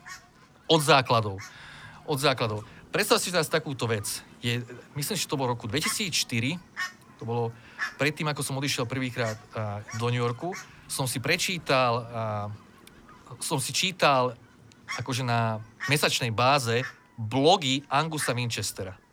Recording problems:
animal sounds; noticeable; throughout; 15 dB below the speech

